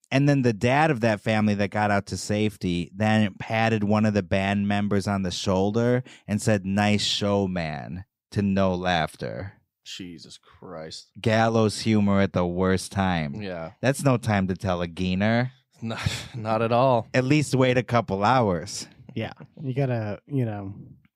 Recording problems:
none

